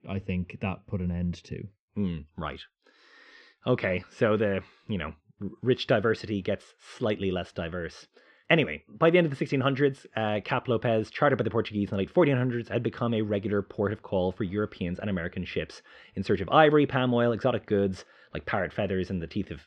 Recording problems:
muffled; slightly; fading above 3.5 kHz

